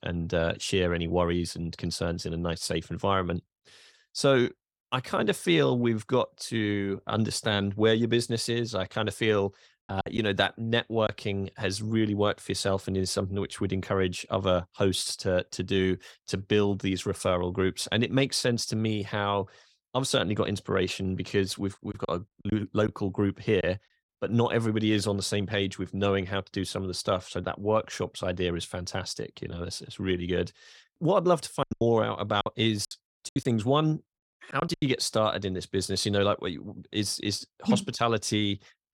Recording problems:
choppy; very; from 10 to 11 s, from 22 to 24 s and from 32 to 35 s; 12% of the speech affected

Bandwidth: 17 kHz